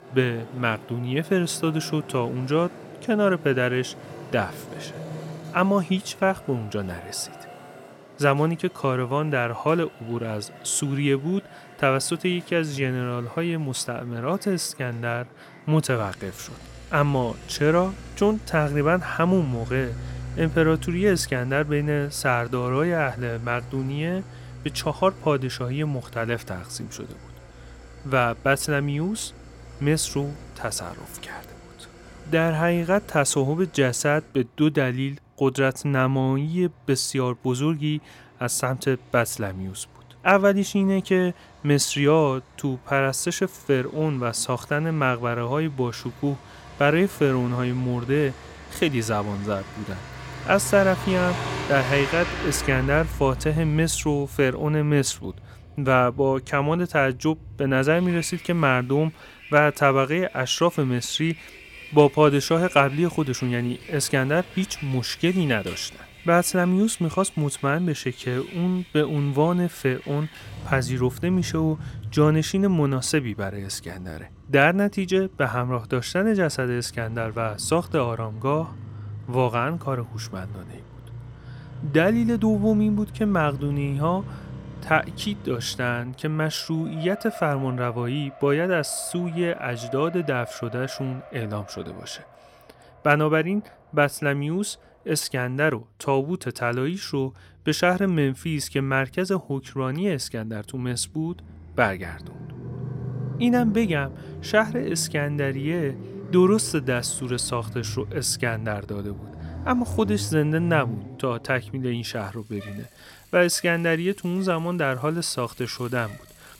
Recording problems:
traffic noise; noticeable; throughout; 15 dB below the speech

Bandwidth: 16.5 kHz